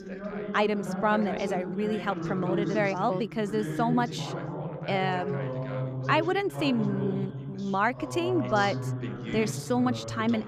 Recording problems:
background chatter; loud; throughout; 2 voices, 5 dB below the speech

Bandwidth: 15 kHz